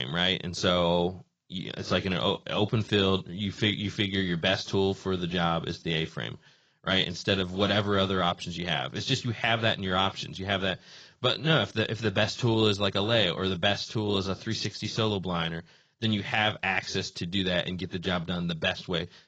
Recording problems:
garbled, watery; badly; nothing above 7.5 kHz
abrupt cut into speech; at the start

